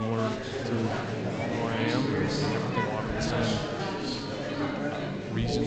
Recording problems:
garbled, watery; slightly; nothing above 7.5 kHz
chatter from many people; very loud; throughout; 3 dB above the speech
abrupt cut into speech; at the start and the end

